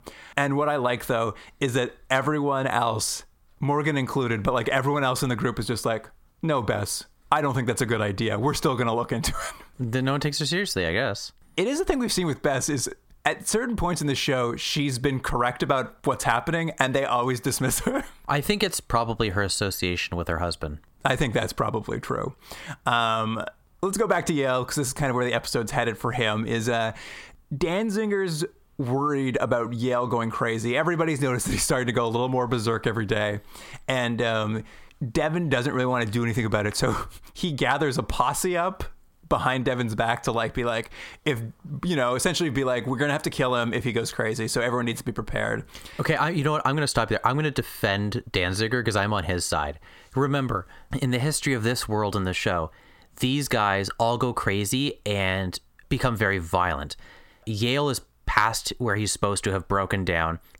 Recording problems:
squashed, flat; heavily

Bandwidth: 16.5 kHz